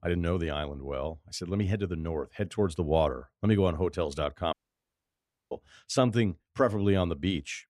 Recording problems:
audio cutting out; at 4.5 s for 1 s

